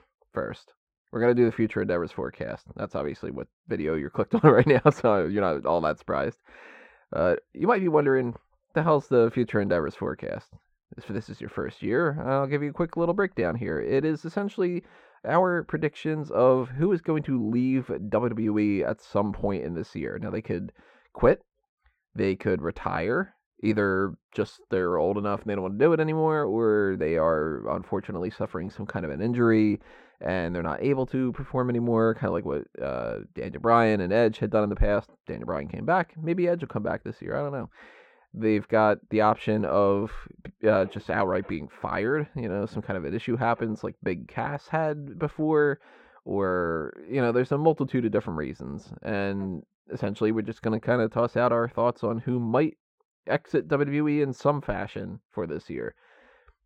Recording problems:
muffled; very; fading above 4 kHz

